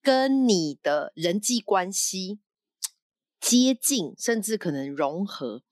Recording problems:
none

